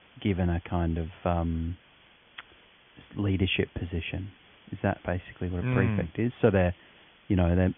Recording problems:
high frequencies cut off; severe; nothing above 3.5 kHz
hiss; faint; throughout; 25 dB below the speech

